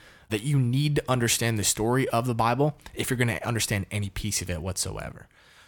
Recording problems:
none

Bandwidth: 18 kHz